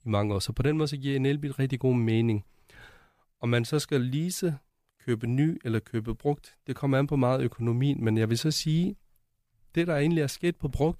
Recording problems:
none

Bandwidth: 15 kHz